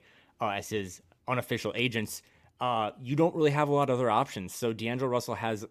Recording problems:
none

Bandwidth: 14.5 kHz